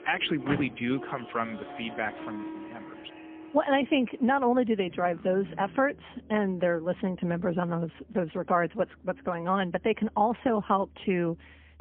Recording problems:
phone-call audio; poor line; nothing above 3.5 kHz
background music; noticeable; throughout; 15 dB below the speech
traffic noise; noticeable; throughout; 15 dB below the speech

